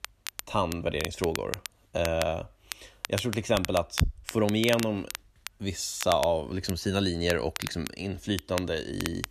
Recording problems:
crackle, like an old record; loud; 9 dB below the speech

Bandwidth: 14 kHz